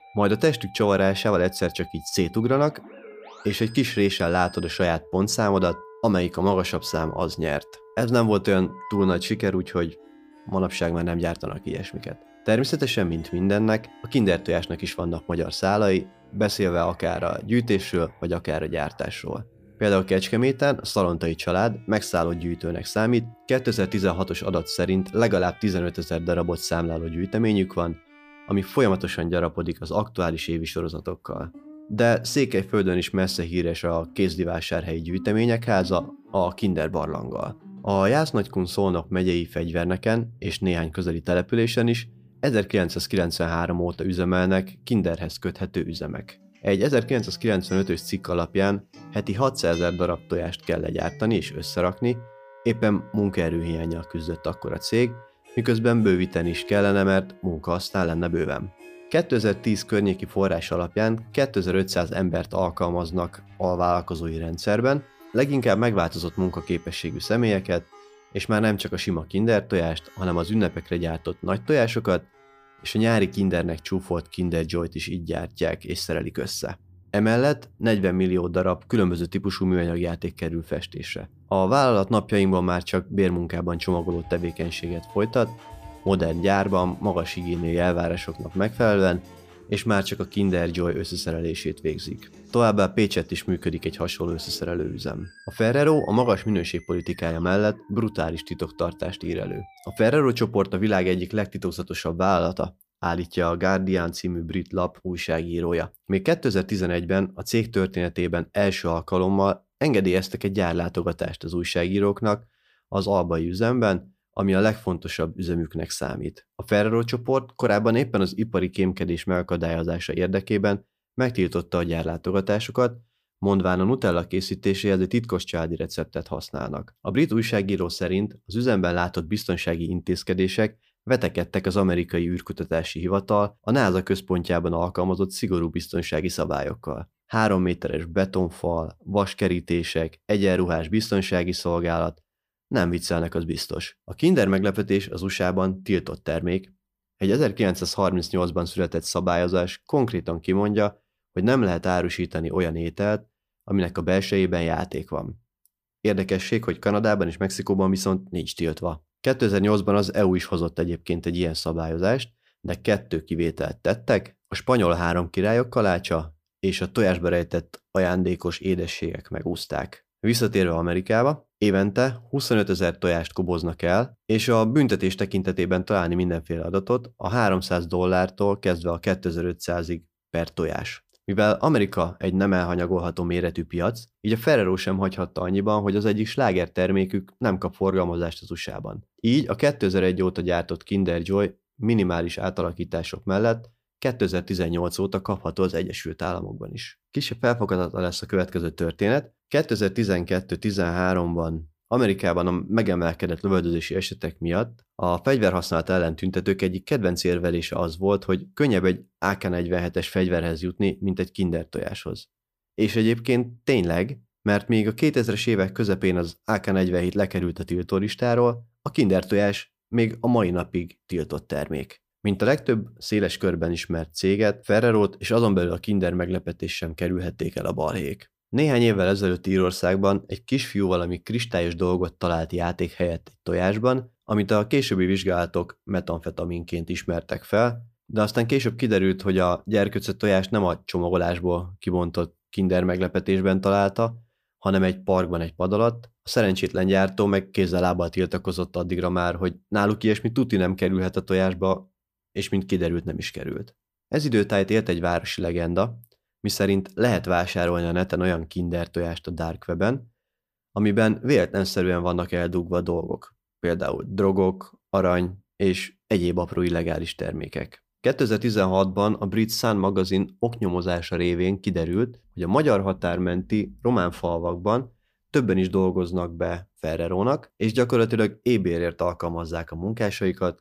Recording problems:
background music; faint; until 1:40; 25 dB below the speech

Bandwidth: 15 kHz